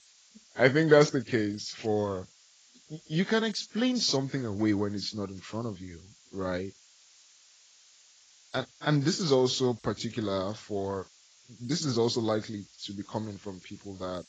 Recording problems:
garbled, watery; badly; nothing above 7.5 kHz
hiss; faint; throughout; 25 dB below the speech

